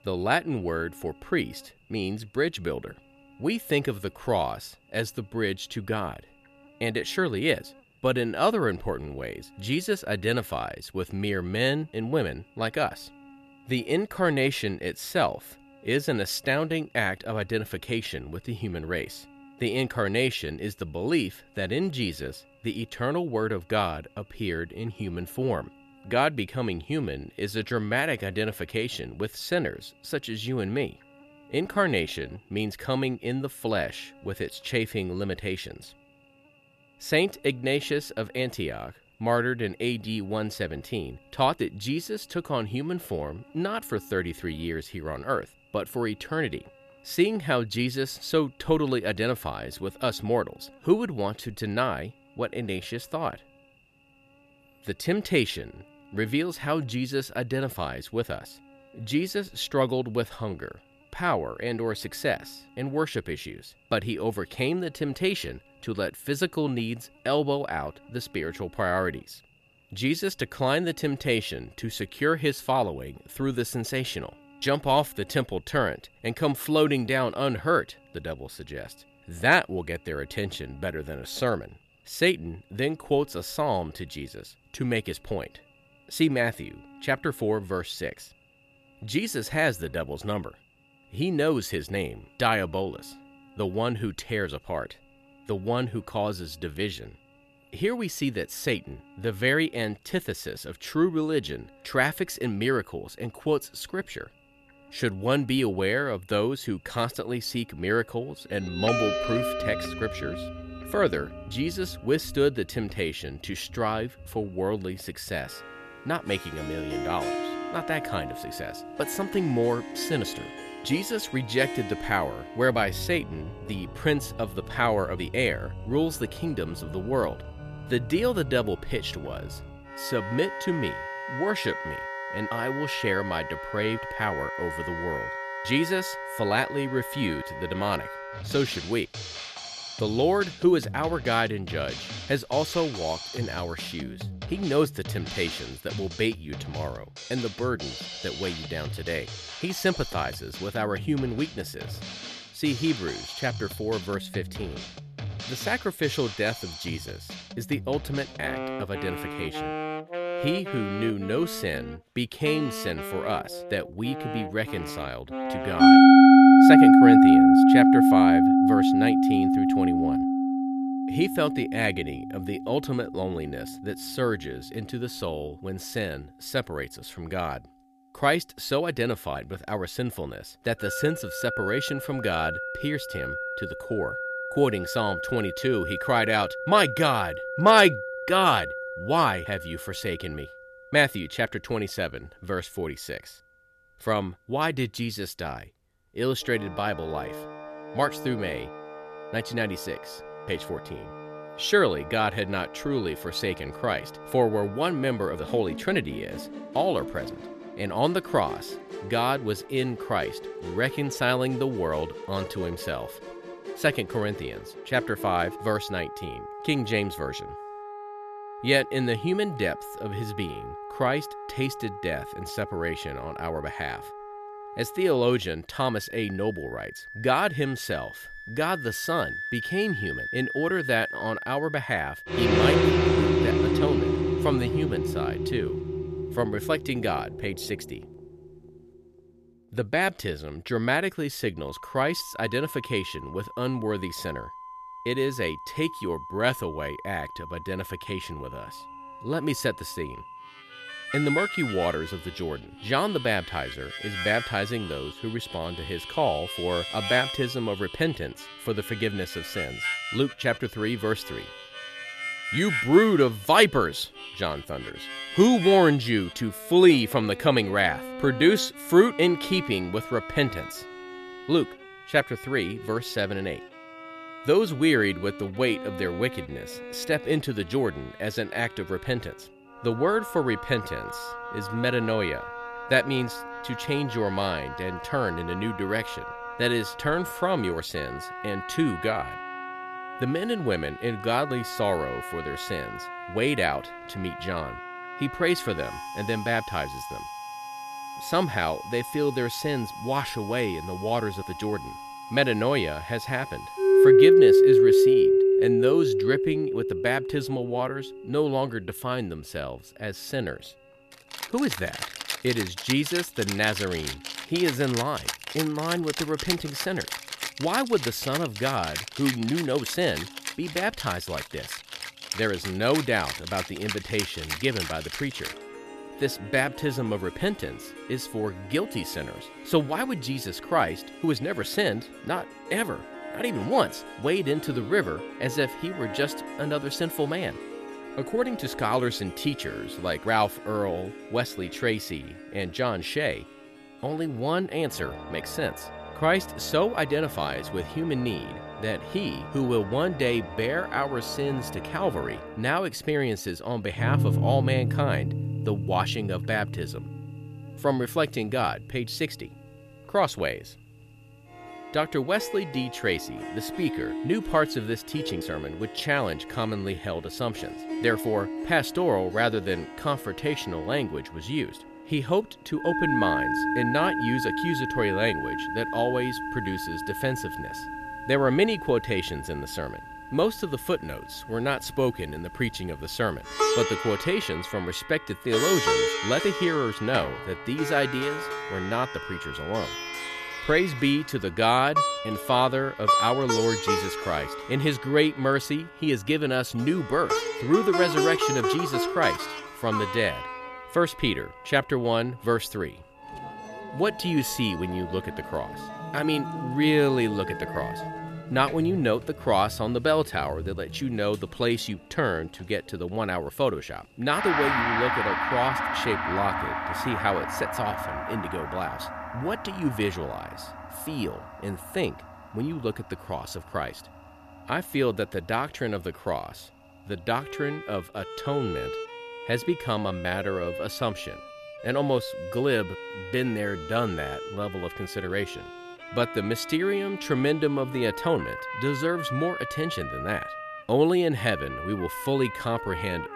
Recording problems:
background music; loud; from 1:49 on; as loud as the speech
electrical hum; faint; until 2:12 and from 4:08 on; 50 Hz, 30 dB below the speech

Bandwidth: 14.5 kHz